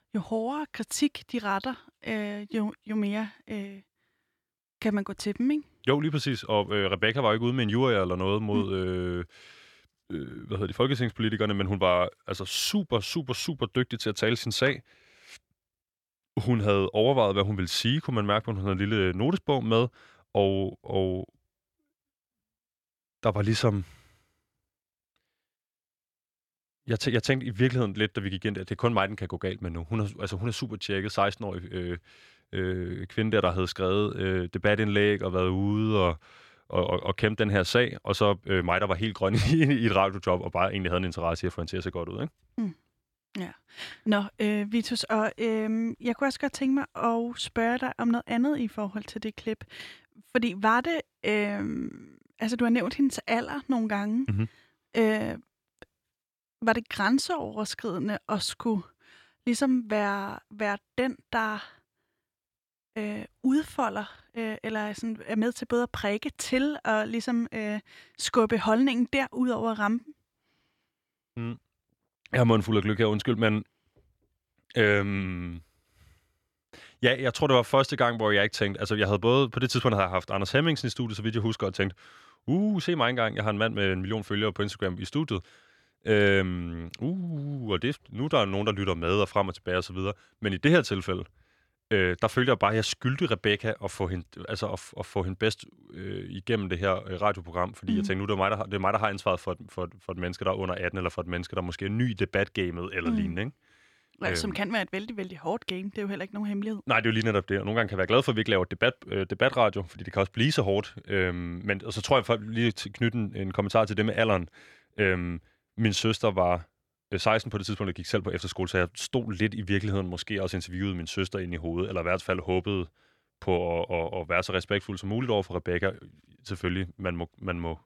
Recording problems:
none

